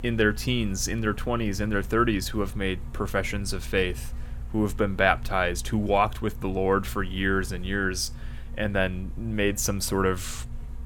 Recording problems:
electrical hum; very faint; throughout; 50 Hz, 25 dB below the speech

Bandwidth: 17 kHz